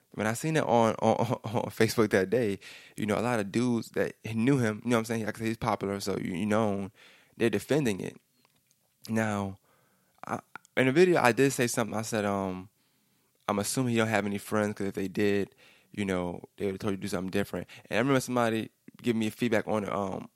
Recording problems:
none

